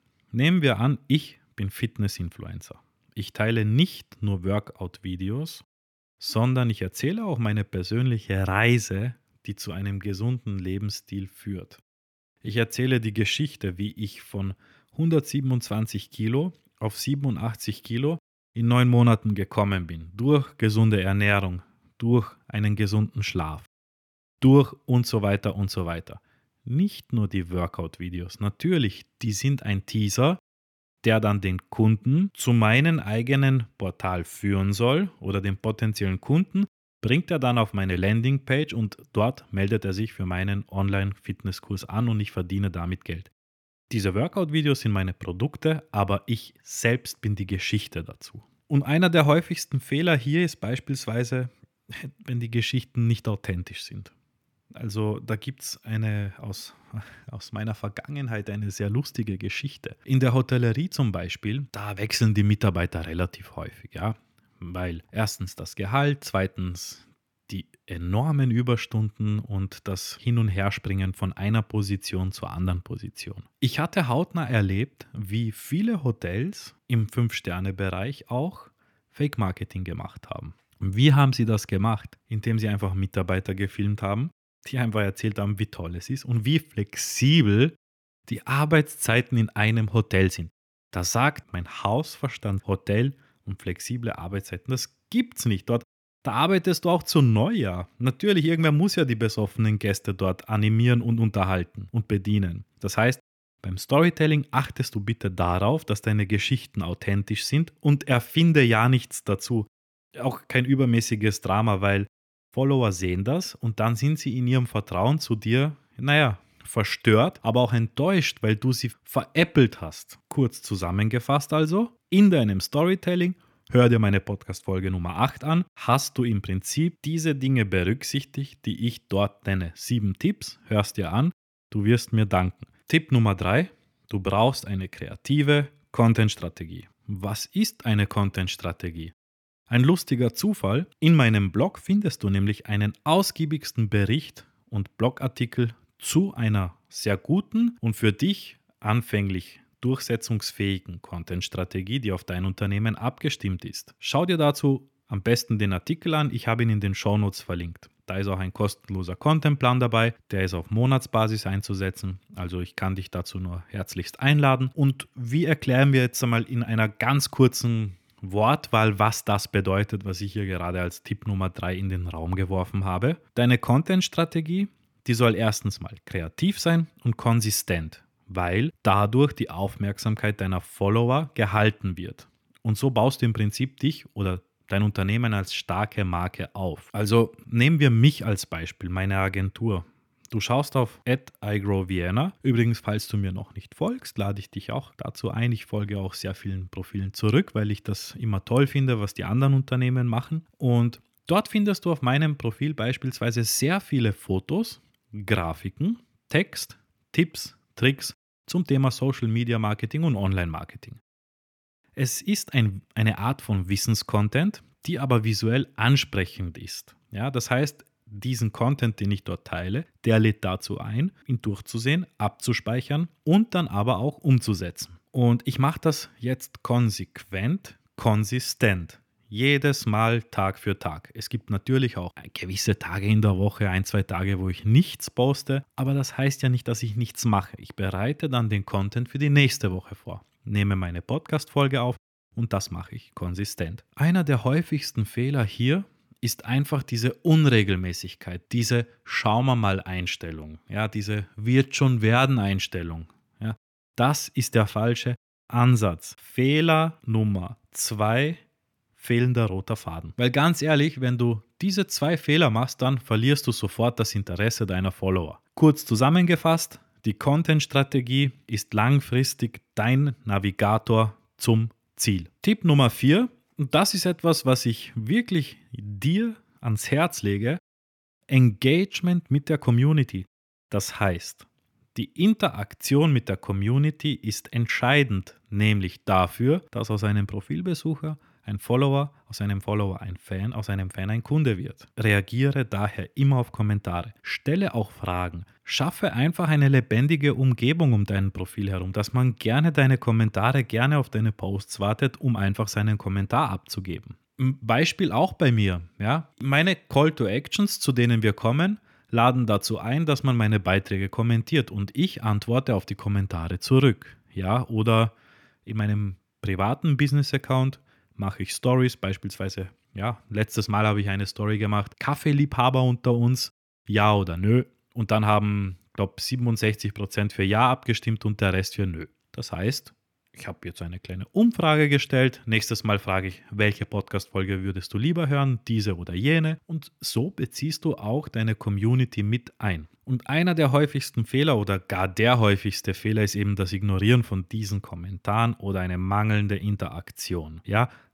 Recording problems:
none

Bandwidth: 18.5 kHz